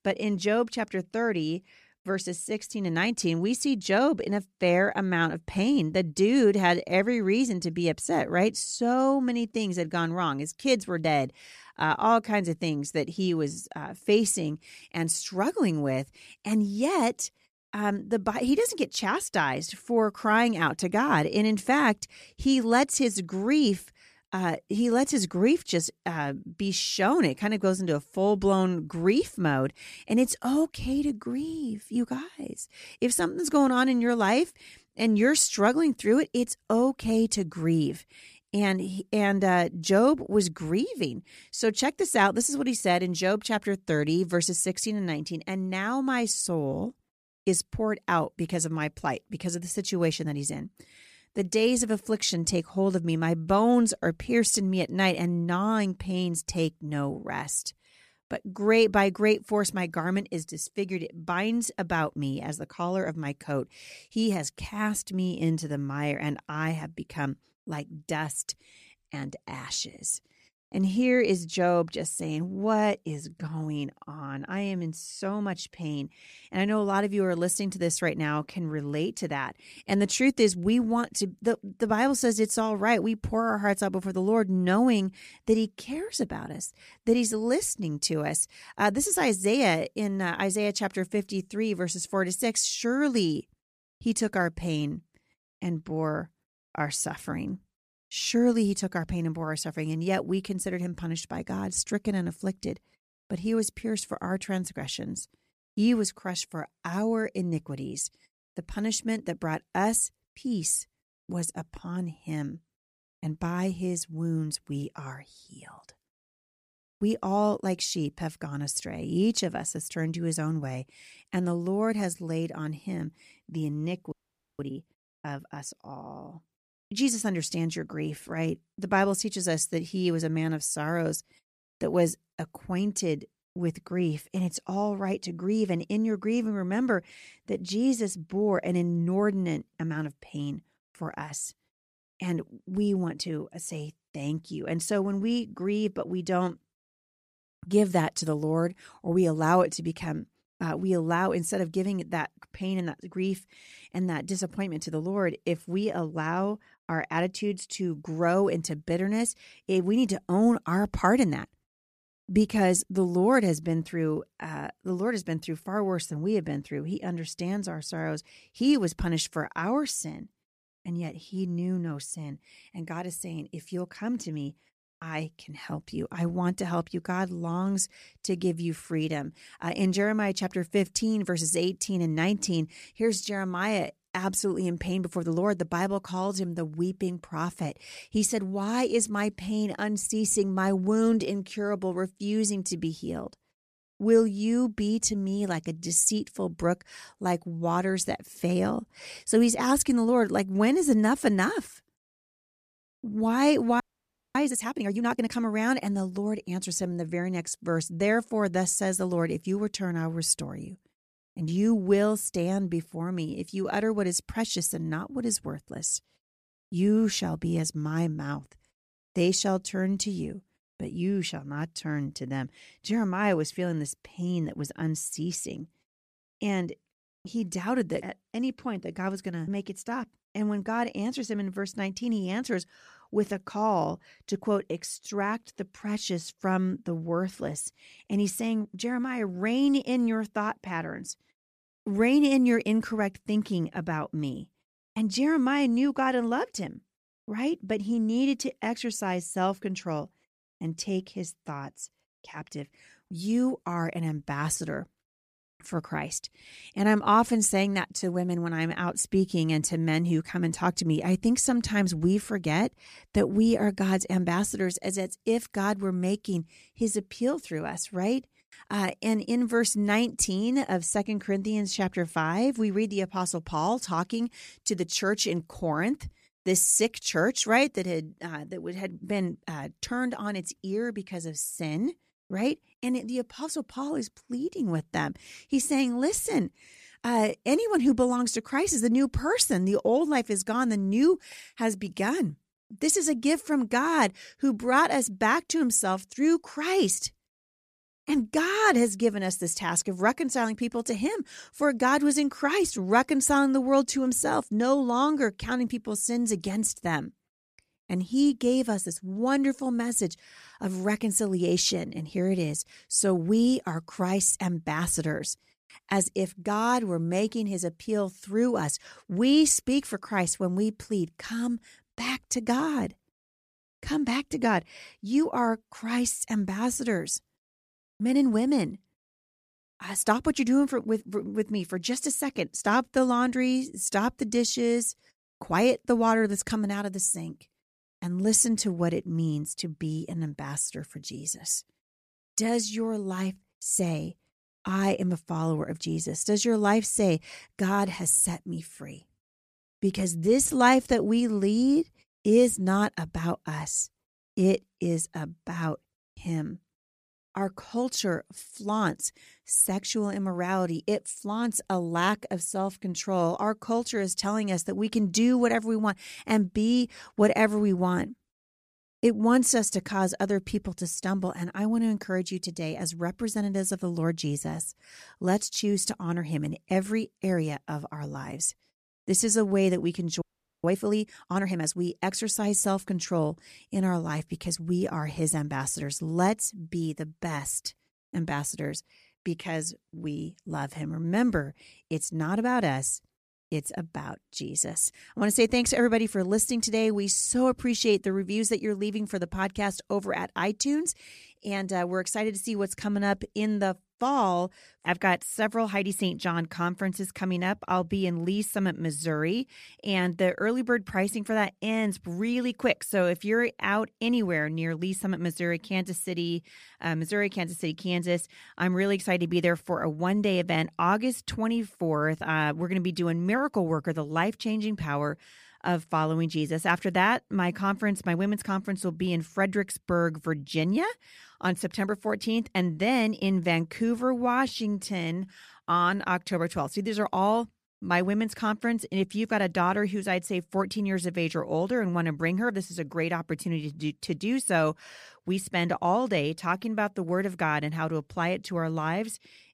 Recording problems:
audio freezing; at 2:04, at 3:24 for 0.5 s and at 6:20

